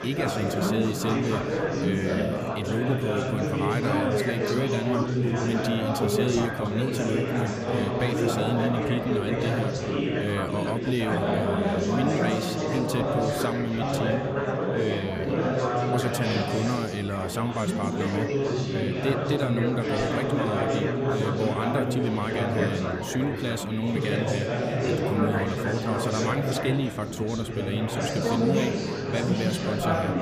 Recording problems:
chatter from many people; very loud; throughout; 3 dB above the speech

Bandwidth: 15 kHz